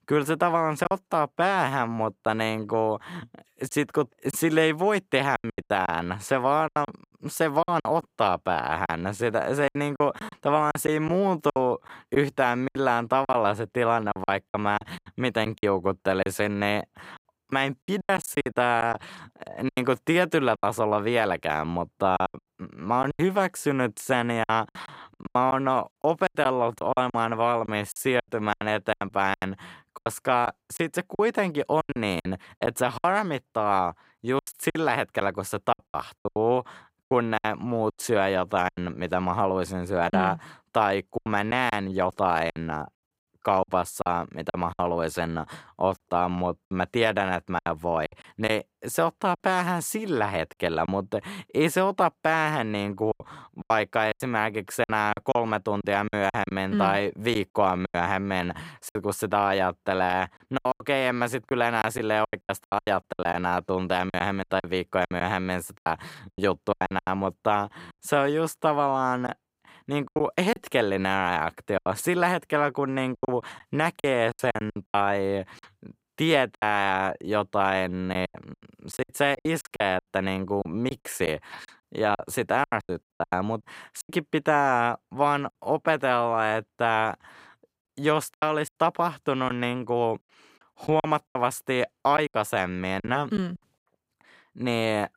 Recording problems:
choppy; very; 11% of the speech affected

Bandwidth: 15.5 kHz